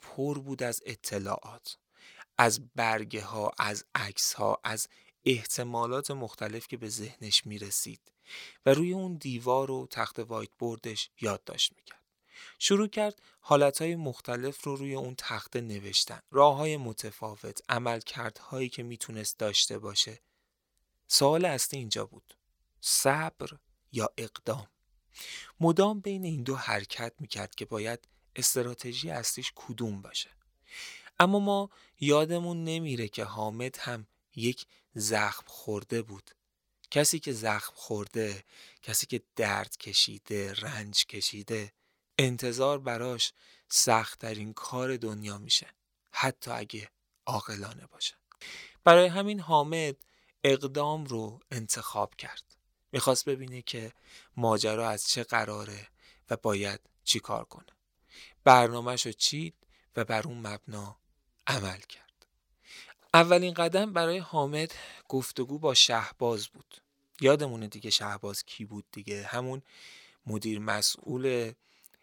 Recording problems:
thin; somewhat; fading below 950 Hz

